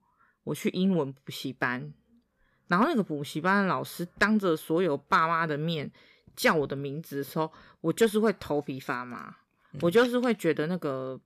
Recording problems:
none

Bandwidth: 14.5 kHz